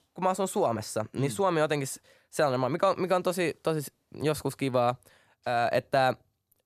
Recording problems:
none

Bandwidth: 14 kHz